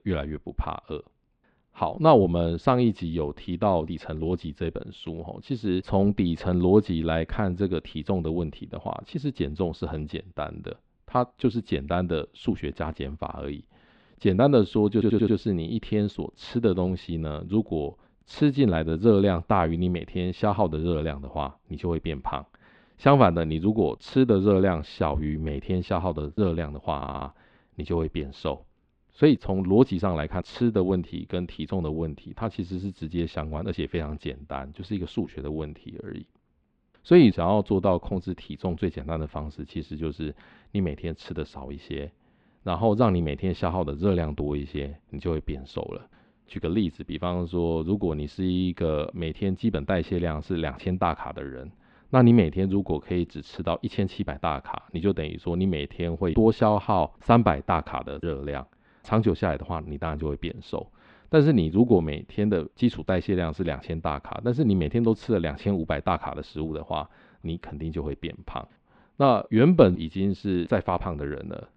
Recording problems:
muffled; slightly; fading above 3.5 kHz
audio stuttering; at 15 s and at 27 s

